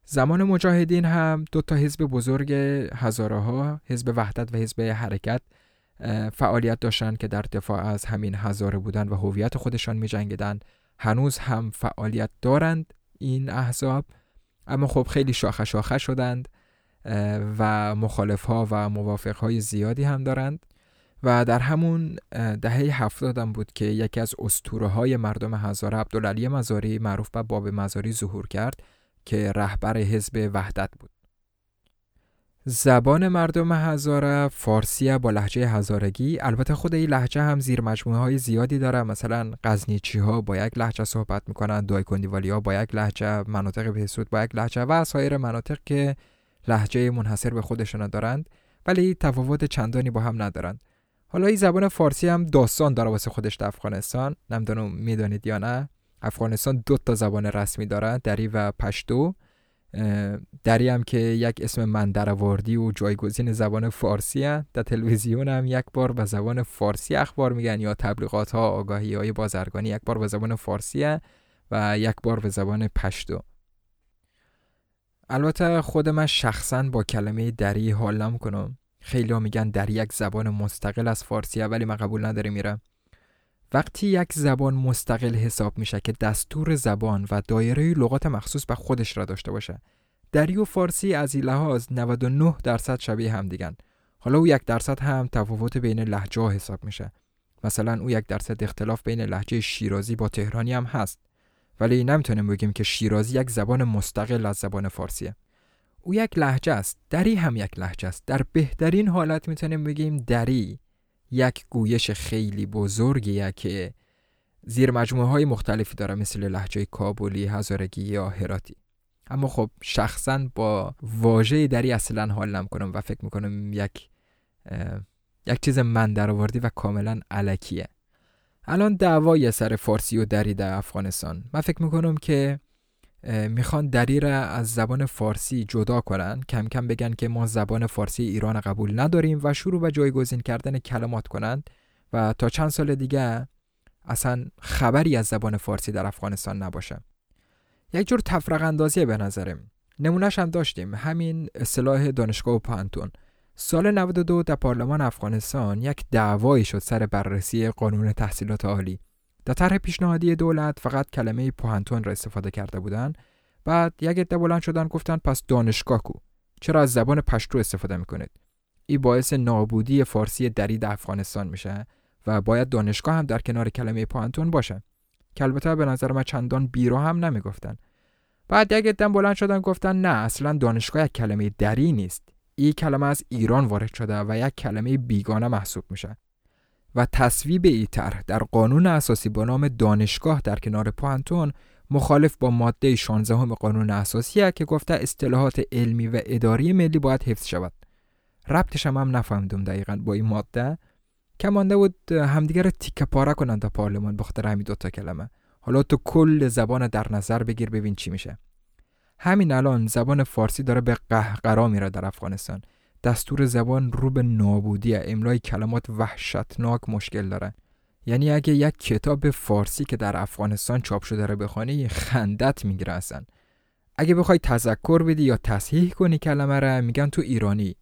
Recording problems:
none

